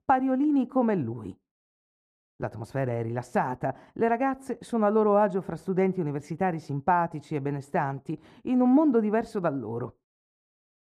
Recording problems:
muffled; very; fading above 2 kHz

